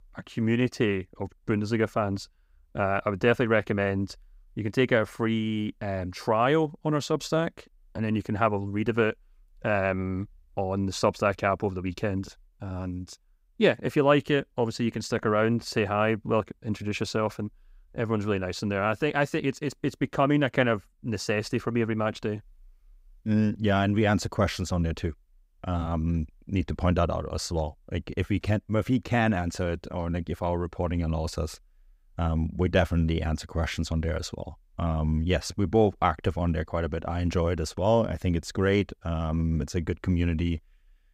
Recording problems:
none

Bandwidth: 15.5 kHz